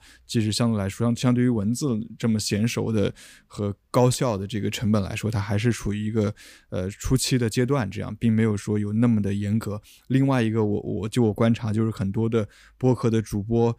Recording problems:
none

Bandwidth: 15 kHz